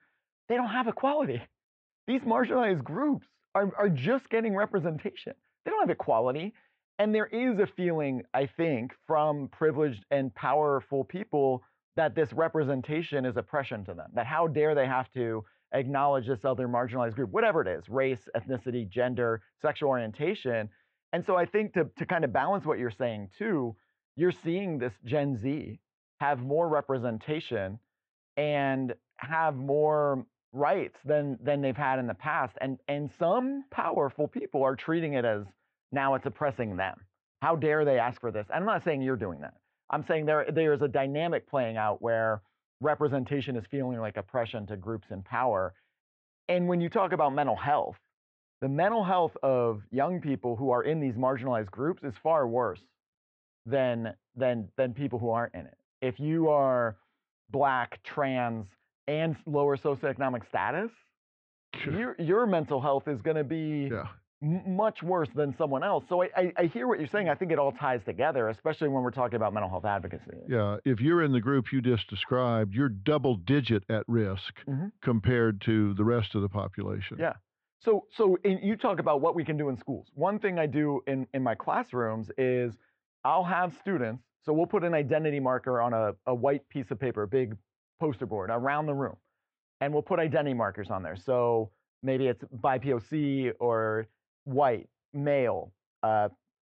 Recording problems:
muffled; very; fading above 3.5 kHz

